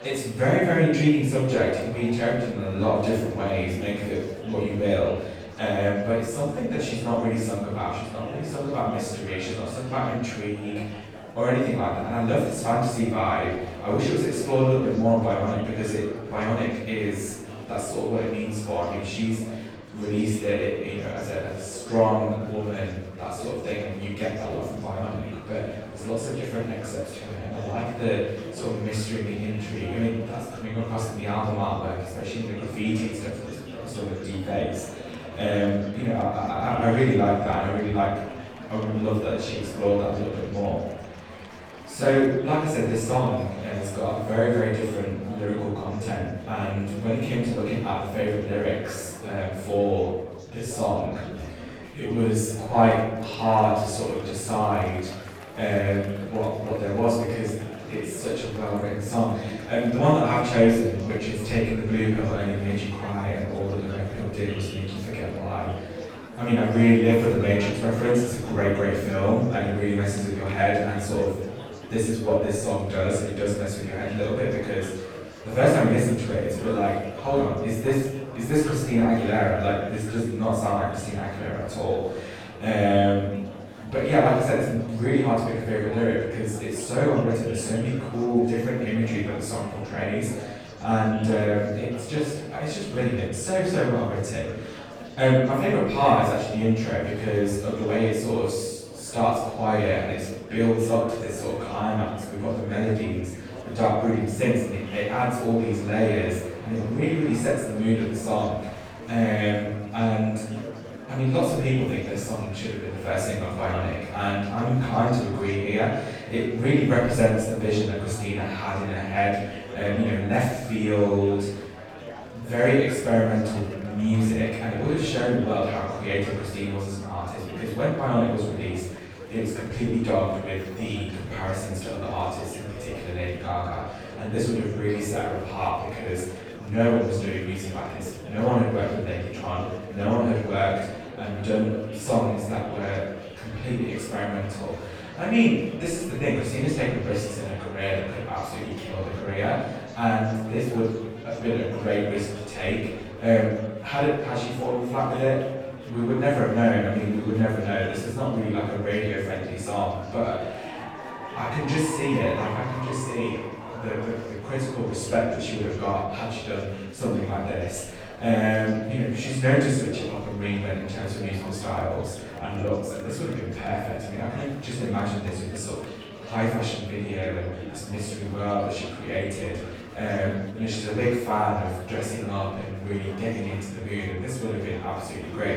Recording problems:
room echo; strong; dies away in 0.8 s
off-mic speech; far
murmuring crowd; noticeable; throughout; 15 dB below the speech

